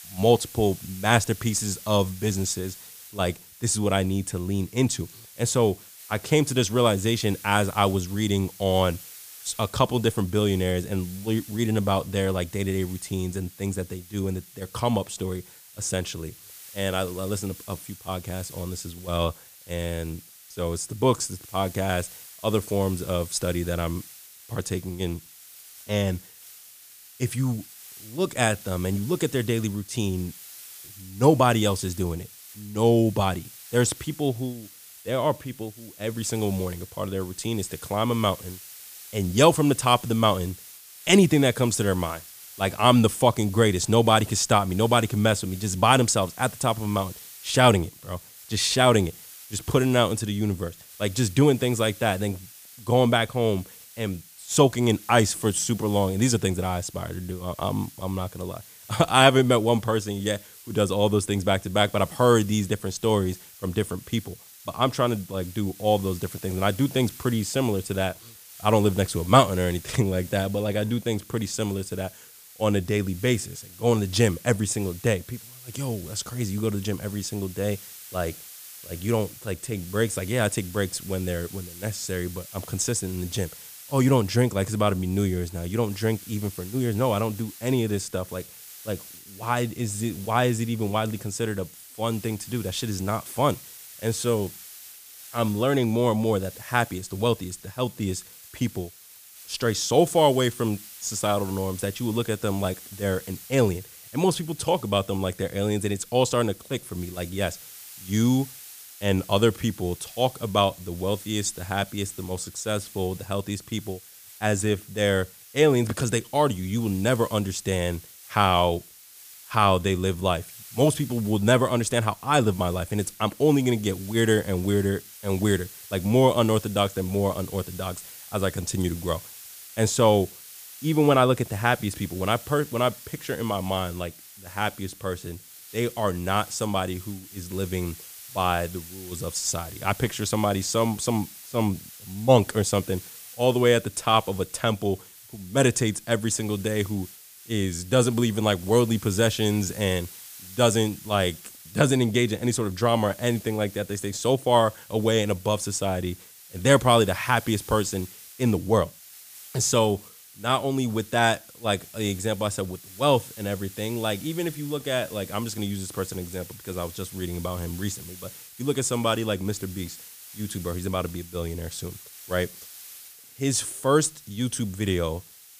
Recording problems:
hiss; noticeable; throughout; 15 dB below the speech

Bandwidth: 15 kHz